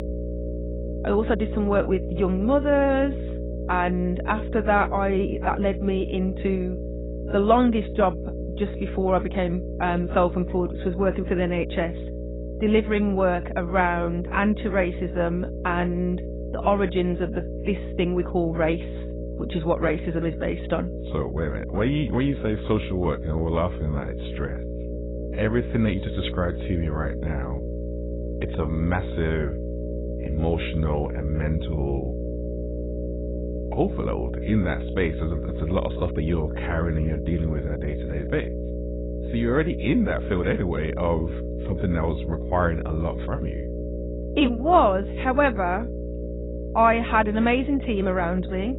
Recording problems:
garbled, watery; badly; nothing above 4 kHz
electrical hum; noticeable; throughout; 60 Hz, 10 dB below the speech

